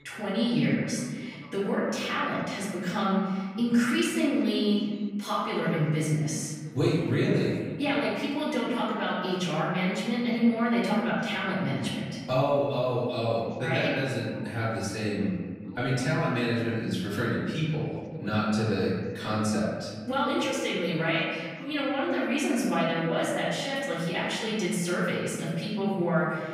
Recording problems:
off-mic speech; far
room echo; noticeable; dies away in 1.7 s
voice in the background; faint; throughout; 25 dB below the speech

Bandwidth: 15.5 kHz